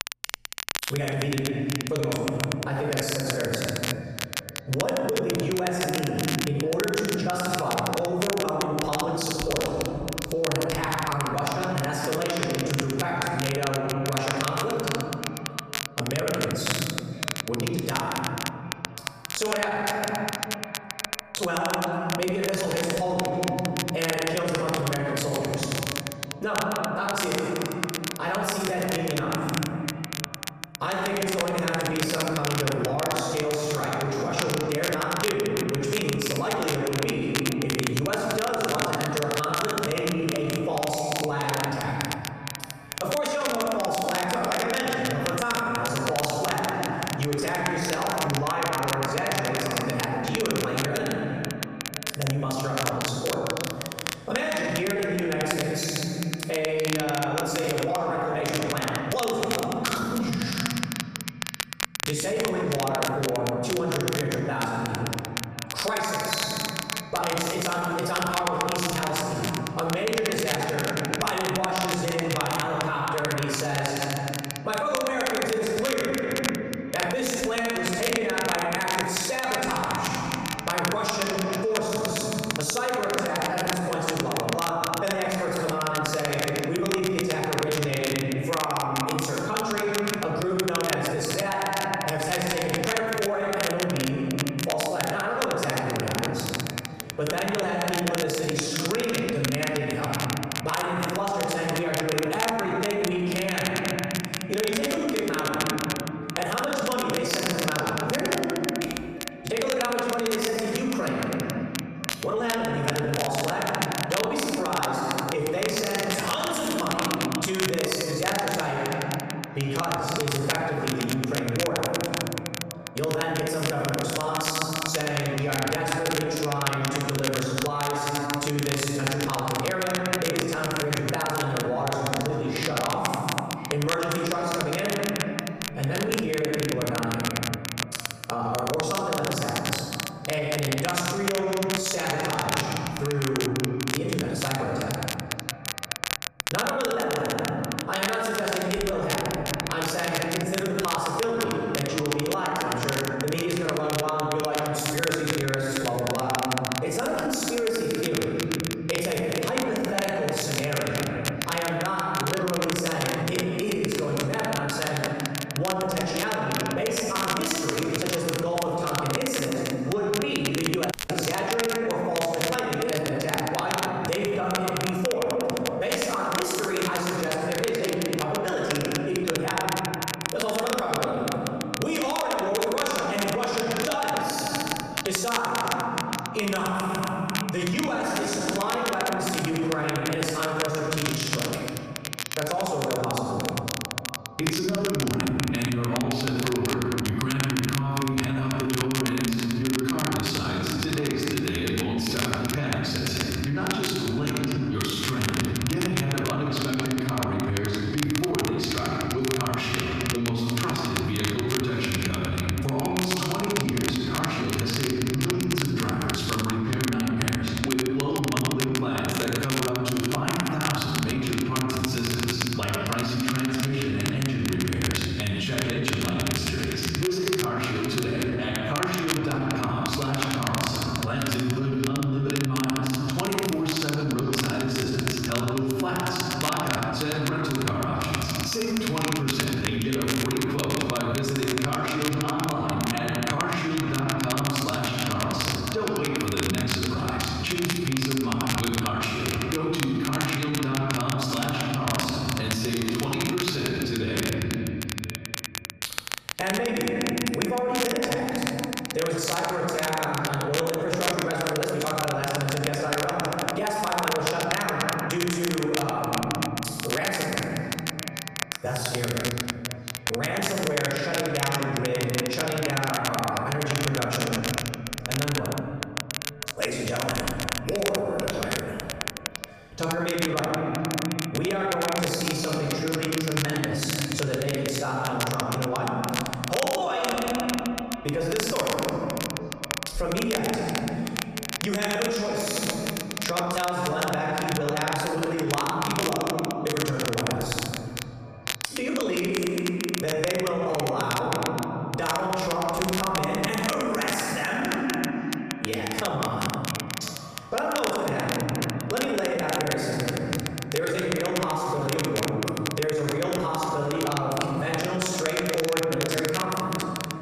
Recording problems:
room echo; strong; dies away in 1.6 s
off-mic speech; far
squashed, flat; heavily
echo of what is said; noticeable; throughout; 500 ms later, 15 dB below the speech
crackle, like an old record; very faint; 5 dB below the speech
audio cutting out; at 2:51

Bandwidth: 14.5 kHz